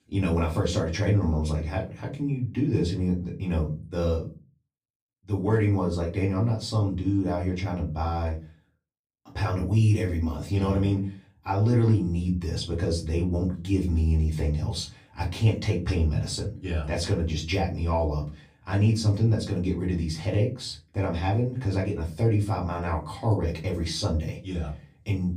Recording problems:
off-mic speech; far
room echo; very slight; dies away in 0.3 s

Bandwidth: 14.5 kHz